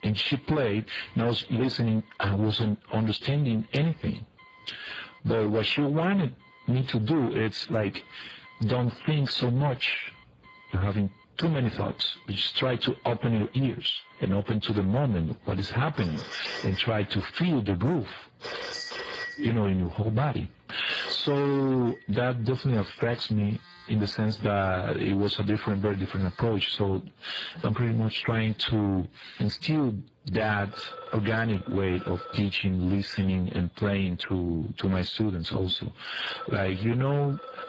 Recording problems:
distortion; heavy; 7 dB below the speech
garbled, watery; badly
squashed, flat; somewhat, background pumping
alarms or sirens; noticeable; throughout; 15 dB below the speech

